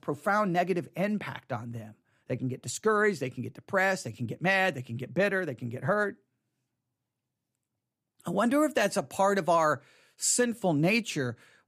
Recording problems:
none

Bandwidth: 15 kHz